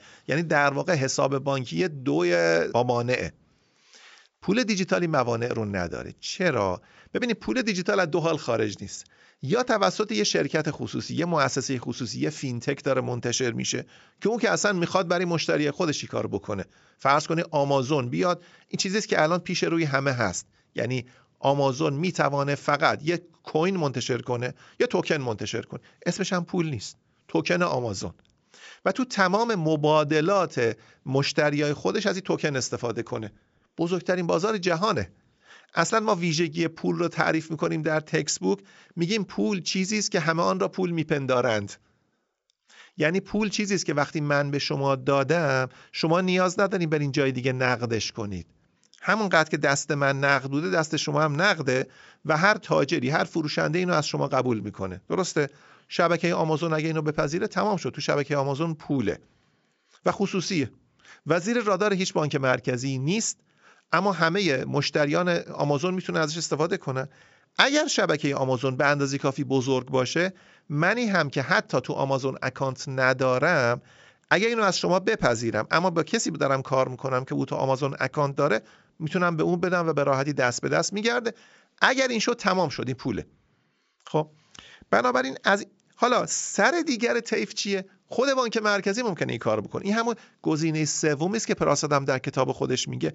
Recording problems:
high frequencies cut off; noticeable; nothing above 7.5 kHz

